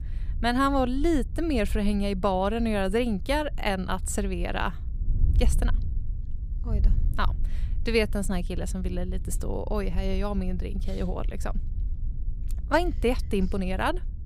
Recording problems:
wind noise on the microphone; occasional gusts; 20 dB below the speech

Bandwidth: 15.5 kHz